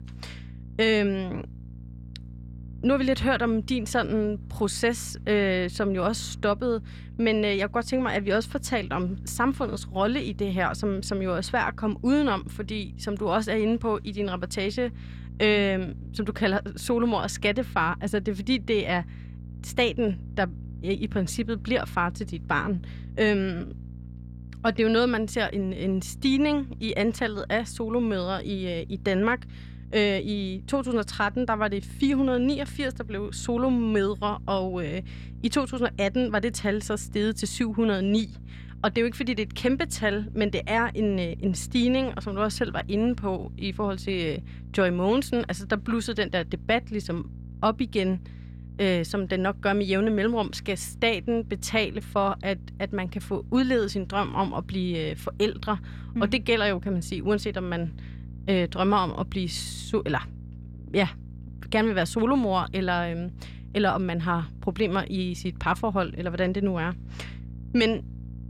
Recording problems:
electrical hum; faint; throughout; 60 Hz, 25 dB below the speech

